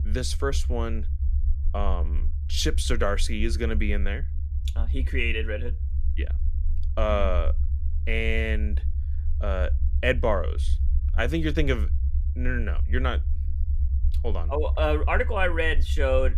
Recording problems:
low rumble; noticeable; throughout; 20 dB below the speech

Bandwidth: 14.5 kHz